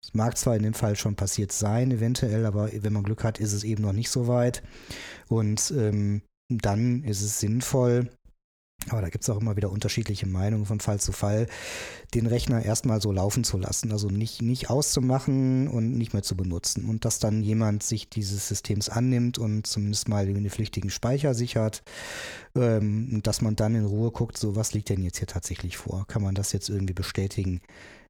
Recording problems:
none

